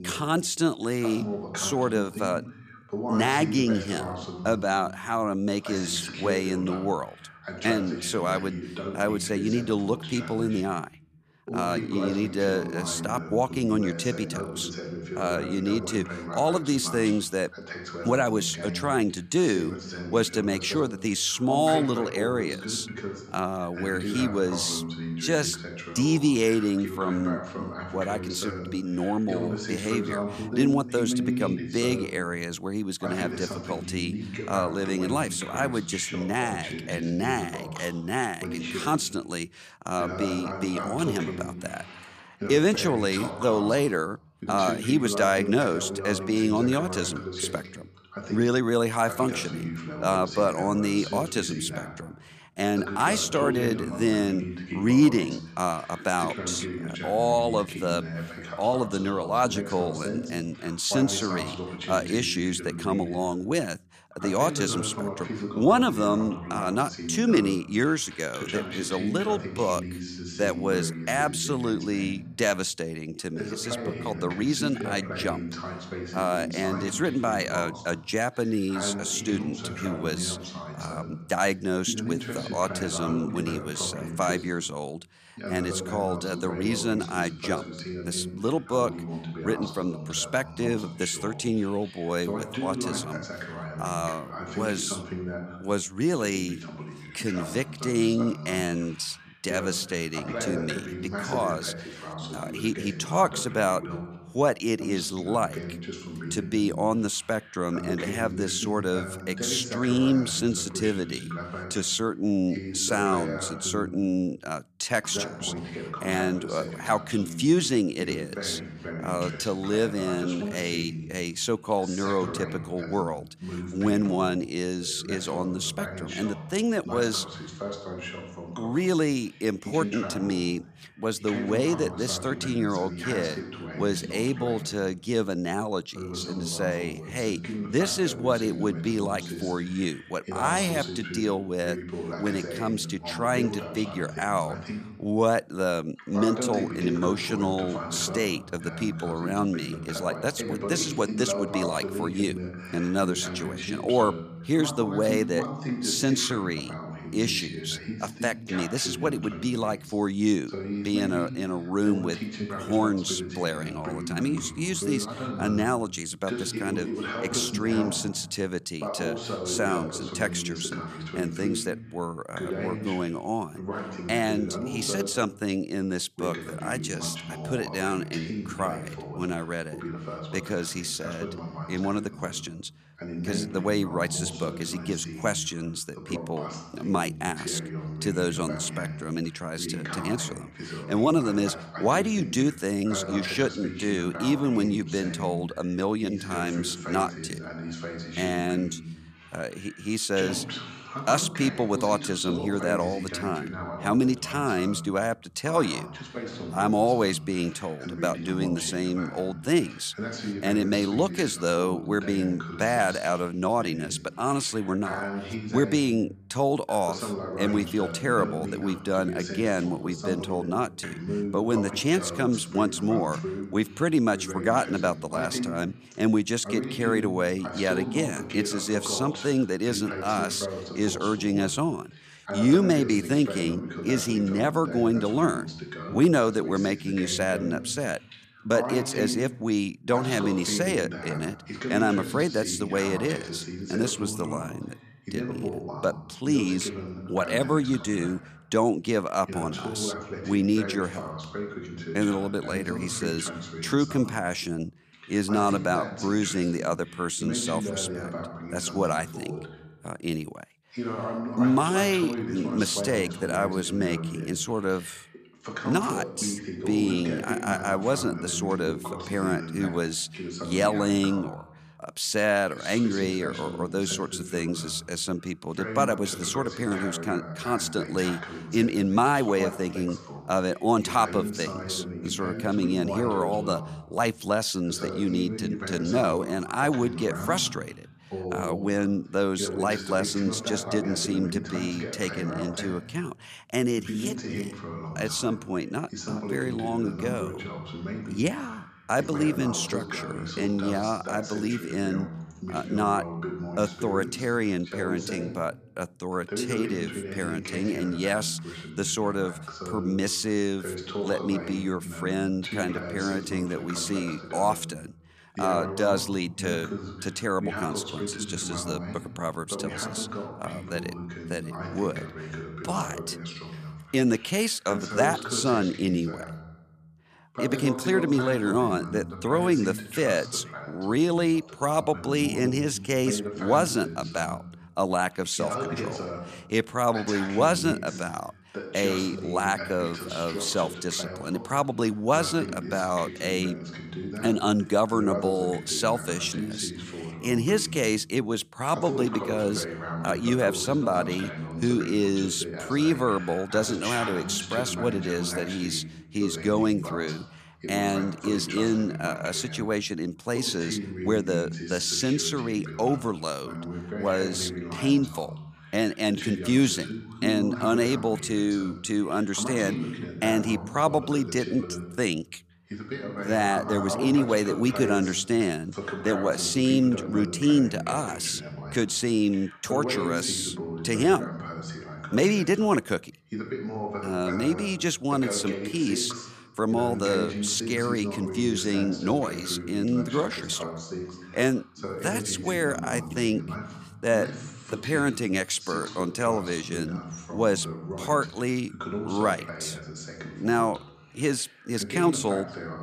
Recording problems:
voice in the background; loud; throughout; 8 dB below the speech

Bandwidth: 14.5 kHz